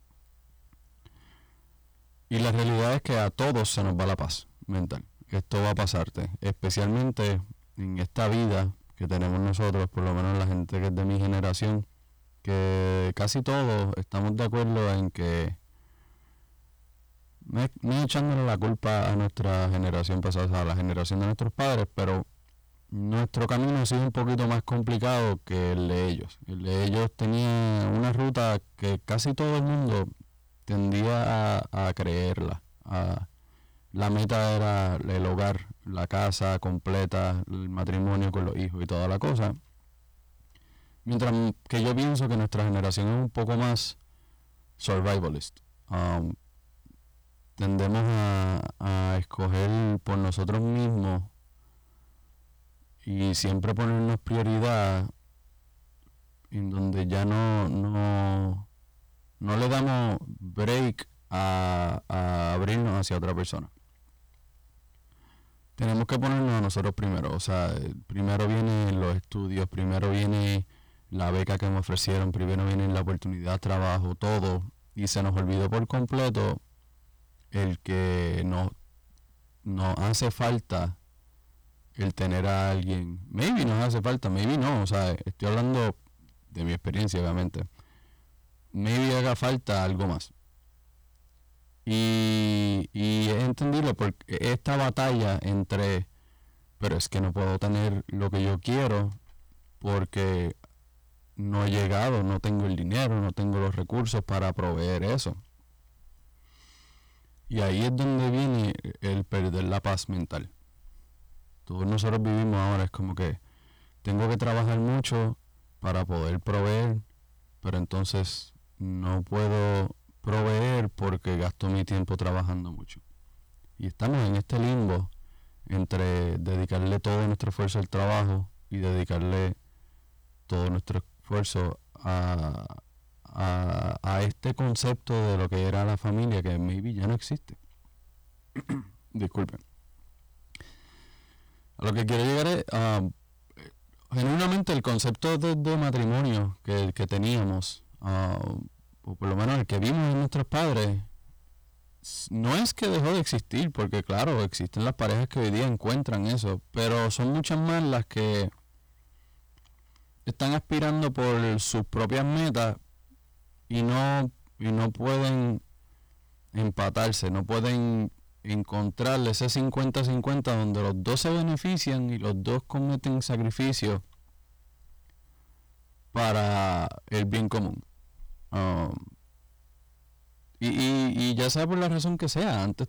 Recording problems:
distortion; heavy; 6 dB below the speech

